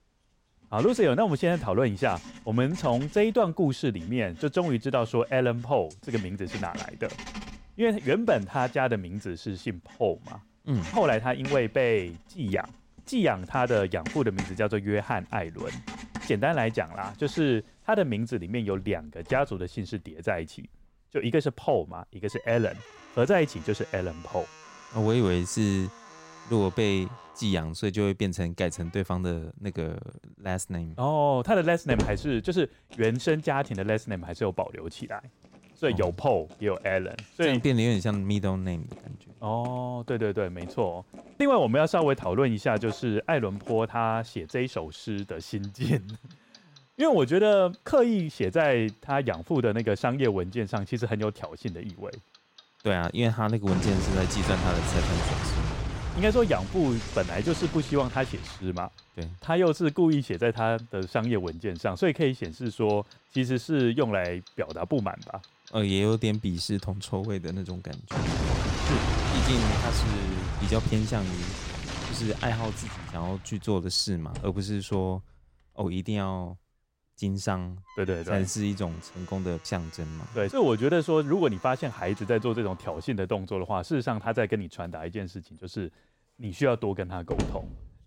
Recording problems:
household noises; loud; throughout; 8 dB below the speech

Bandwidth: 16 kHz